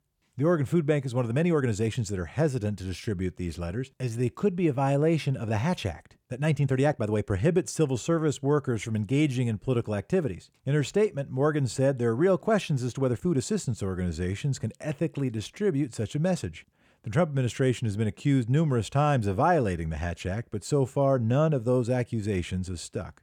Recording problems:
uneven, jittery; strongly; from 1.5 to 21 s

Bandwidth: 18 kHz